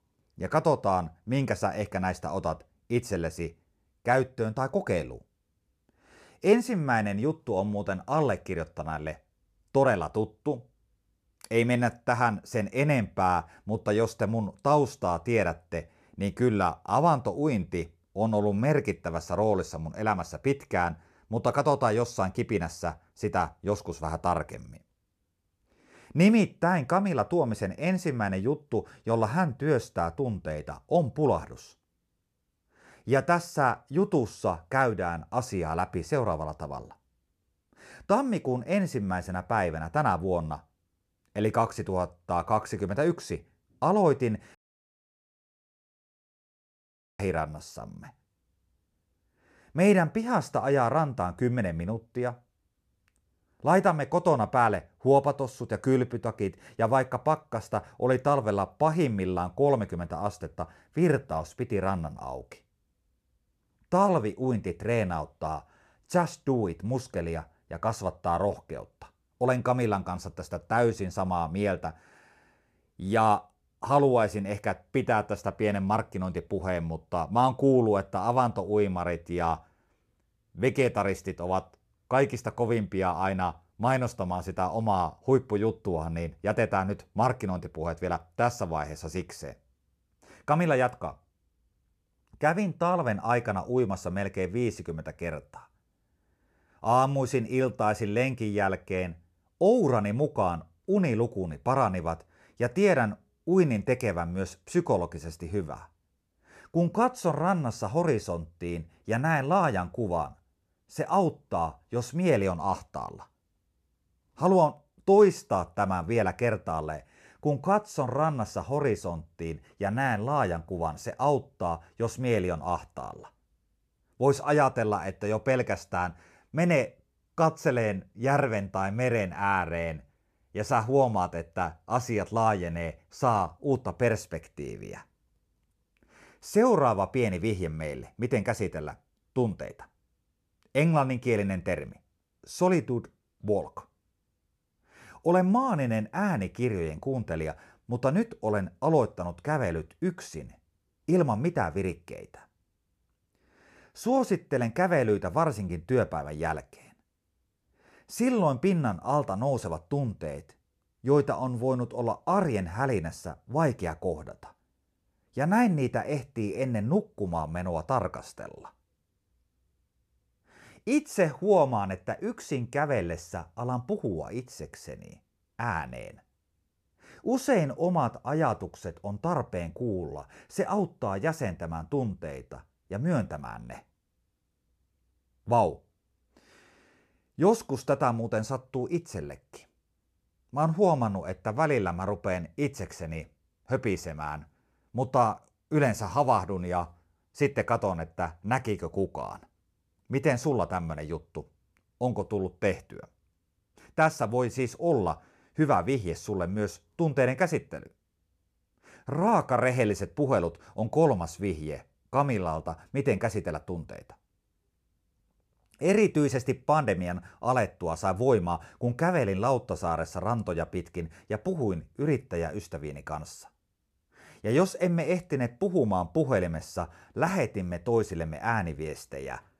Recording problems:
audio cutting out; at 45 s for 2.5 s

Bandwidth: 14.5 kHz